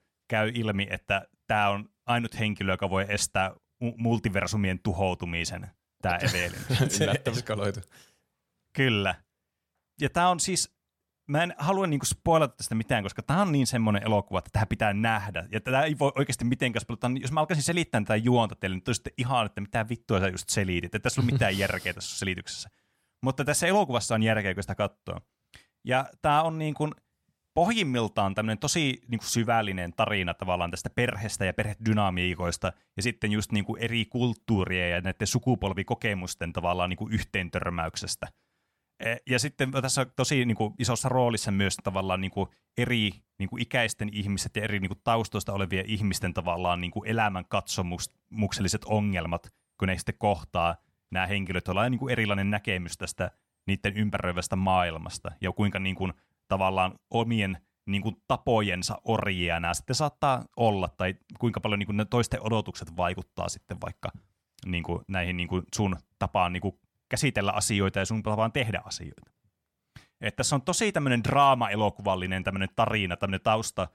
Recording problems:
none

